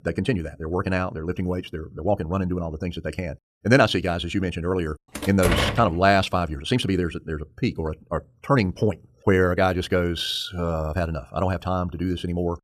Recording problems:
wrong speed, natural pitch; too fast; 1.5 times normal speed
door banging; loud; at 5 s; peak 1 dB above the speech

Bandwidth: 14 kHz